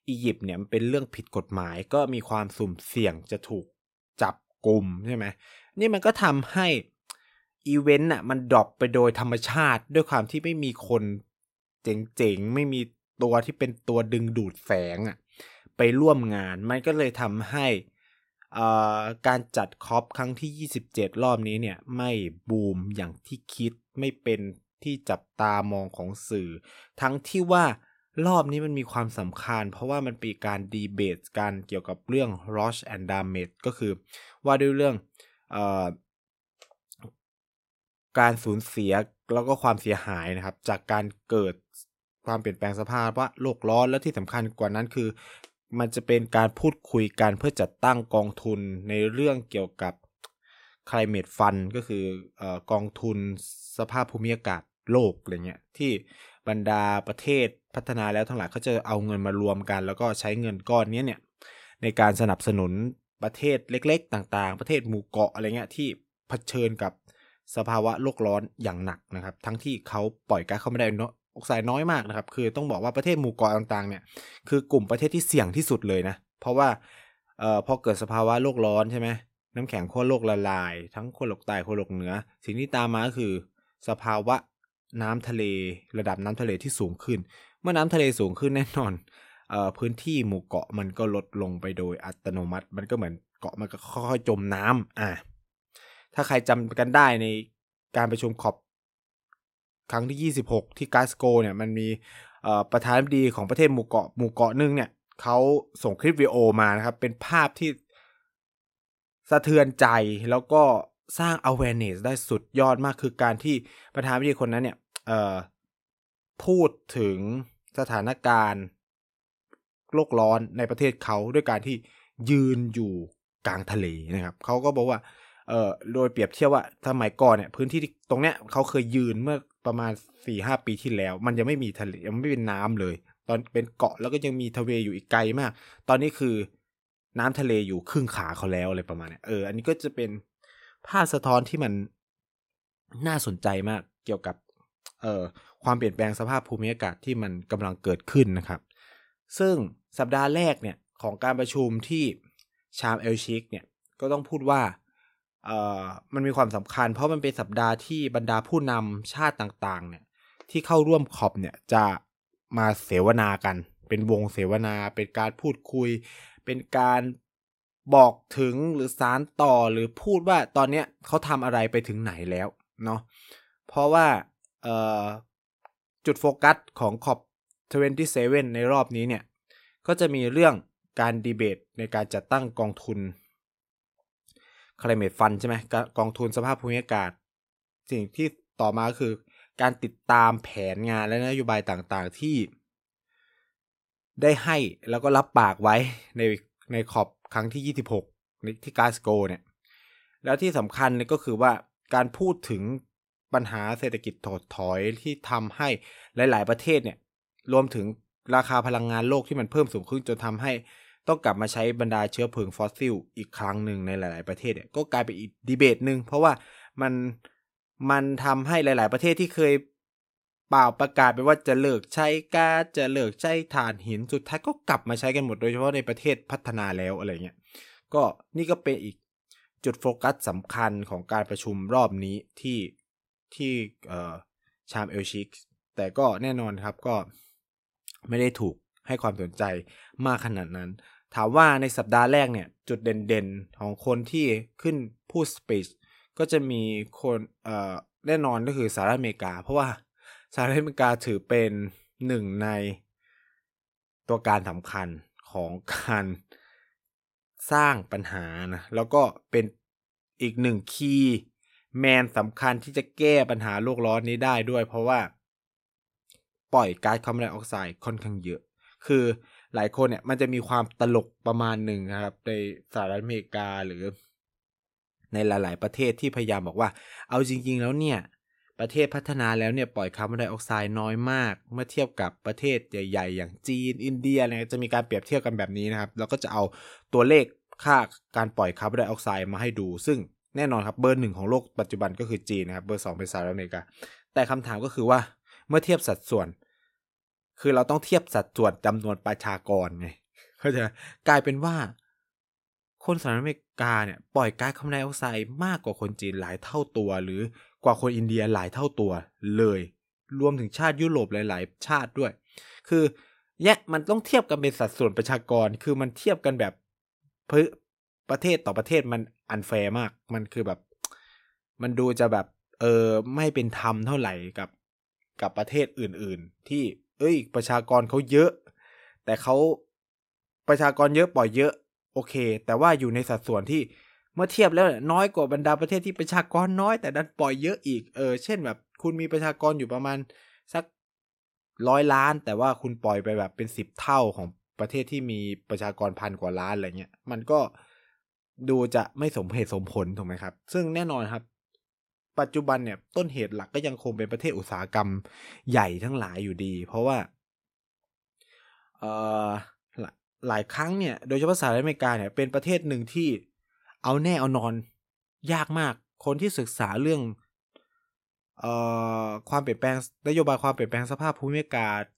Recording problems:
none

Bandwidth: 16 kHz